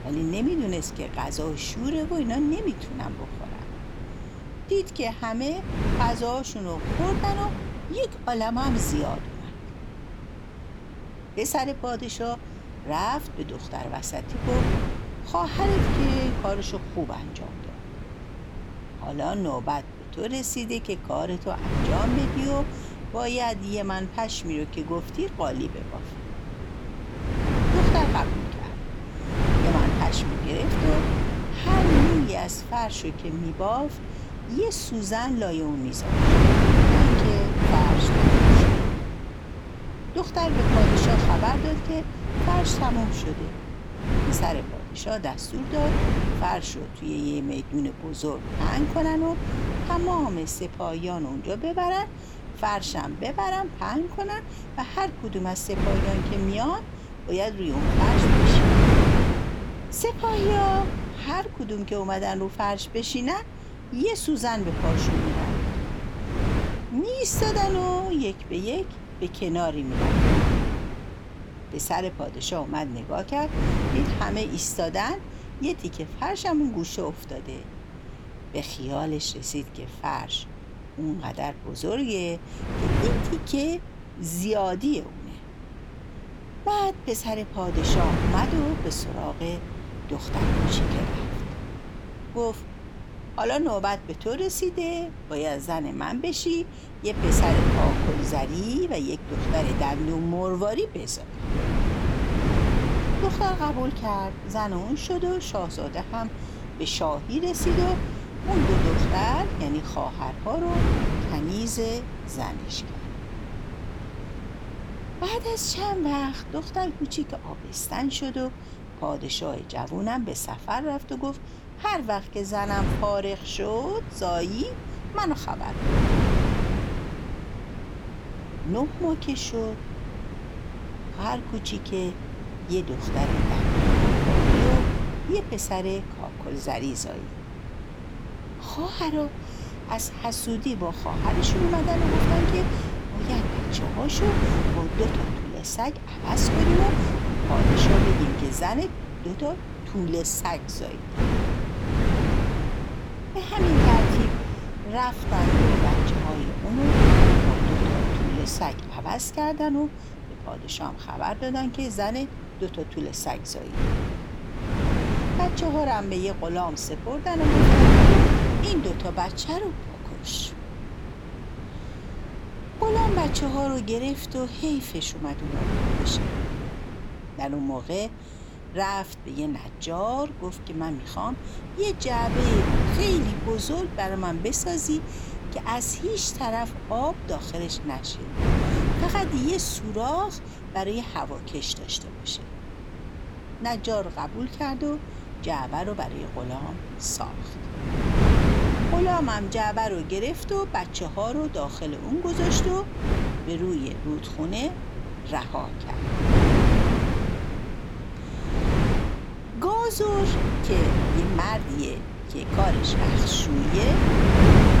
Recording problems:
wind noise on the microphone; heavy; 2 dB below the speech

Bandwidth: 18.5 kHz